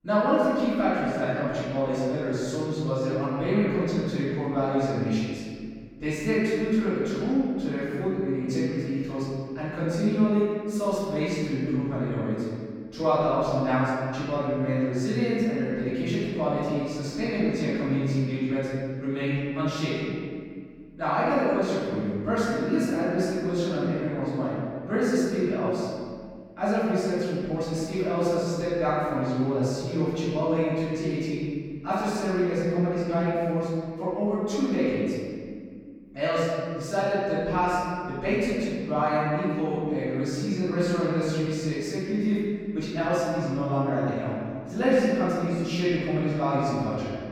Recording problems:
room echo; strong; dies away in 1.9 s
off-mic speech; far

